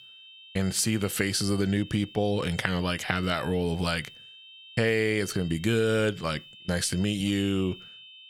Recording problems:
high-pitched whine; noticeable; throughout; 3 kHz, 20 dB below the speech

